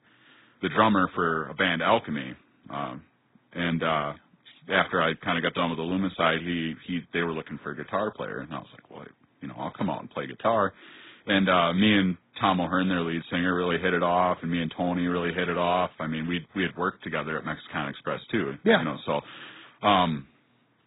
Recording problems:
garbled, watery; badly
high frequencies cut off; severe; nothing above 4 kHz

